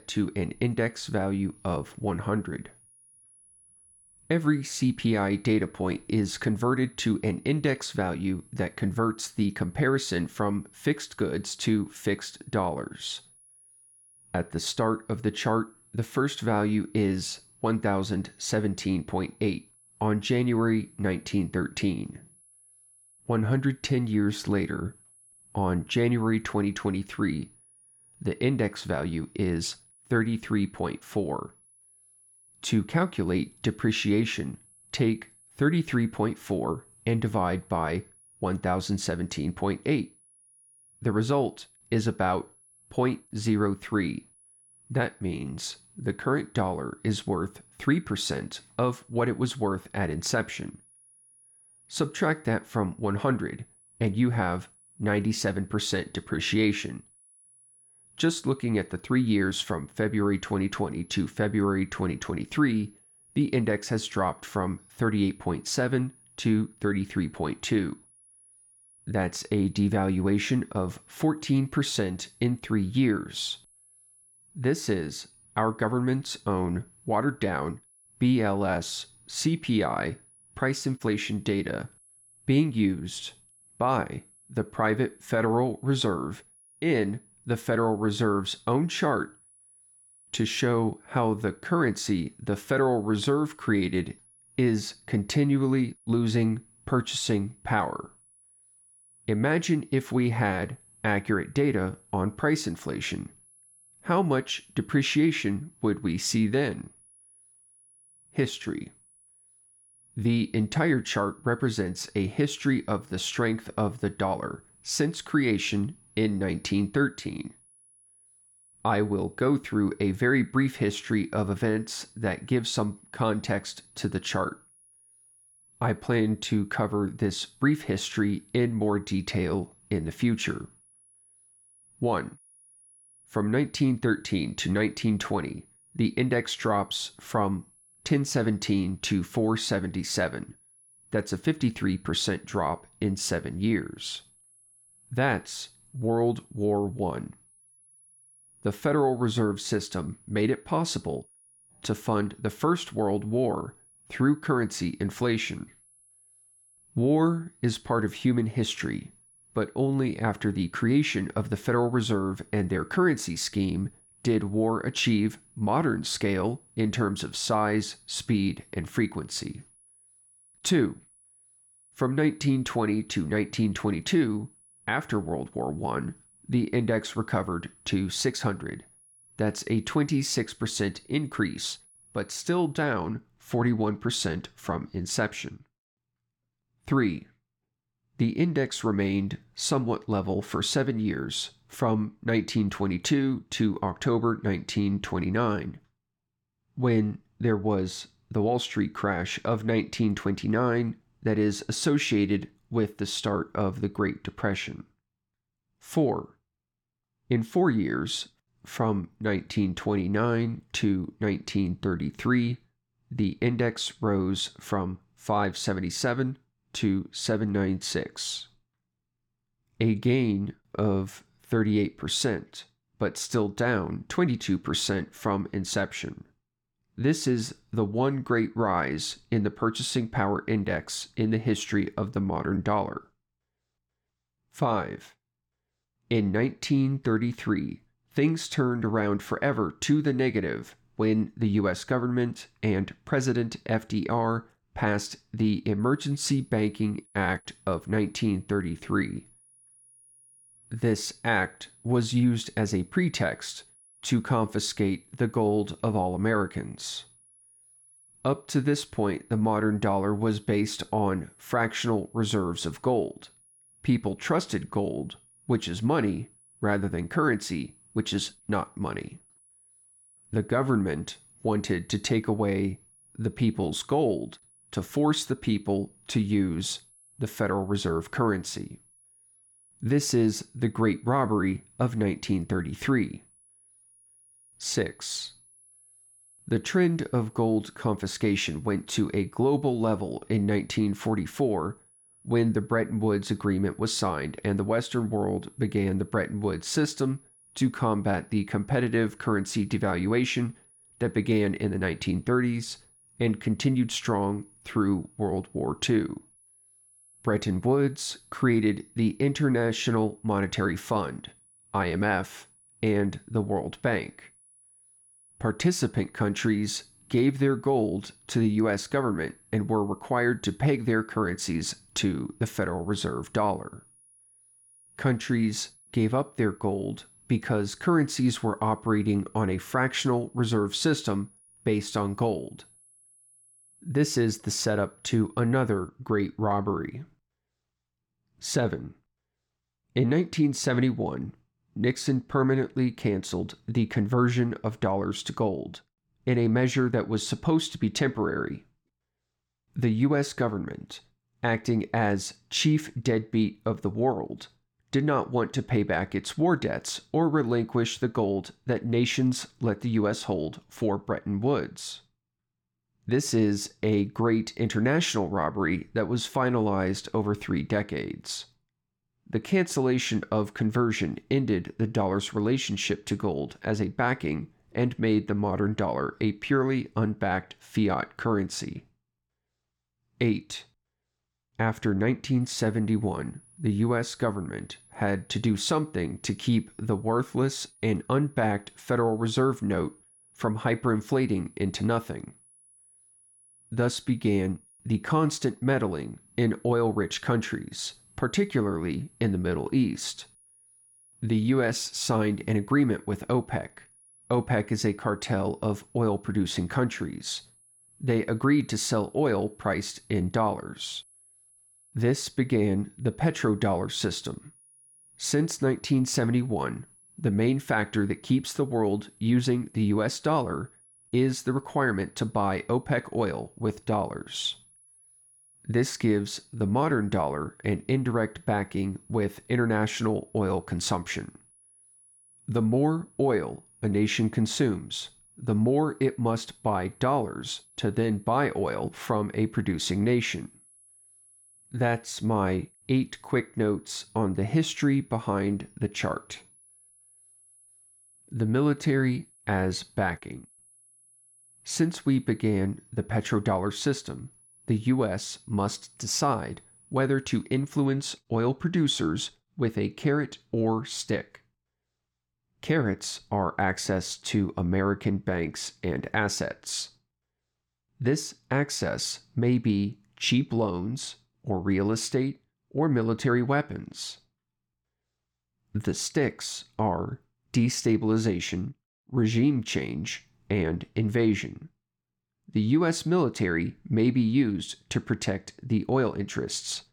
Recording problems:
high-pitched whine; faint; until 3:03, from 4:06 to 5:36 and from 6:22 to 7:38; 10.5 kHz, 30 dB below the speech

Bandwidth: 18 kHz